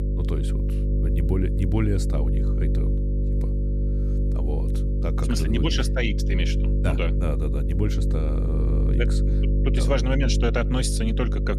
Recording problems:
electrical hum; loud; throughout; 50 Hz, 6 dB below the speech

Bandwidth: 15 kHz